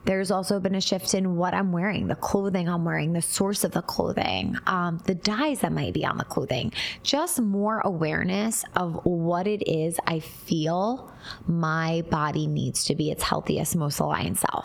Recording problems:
squashed, flat; heavily

